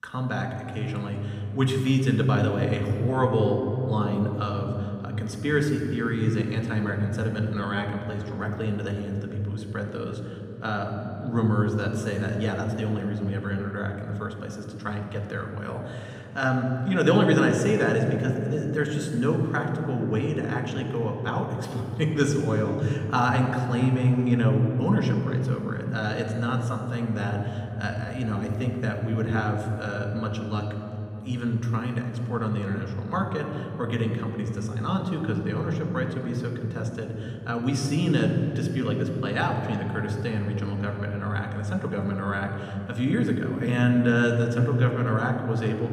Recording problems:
room echo; noticeable; dies away in 3 s
off-mic speech; somewhat distant

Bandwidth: 15 kHz